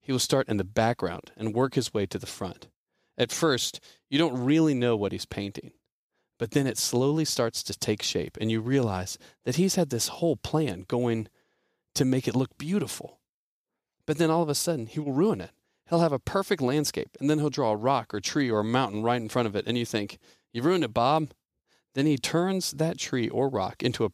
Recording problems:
none

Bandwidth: 15 kHz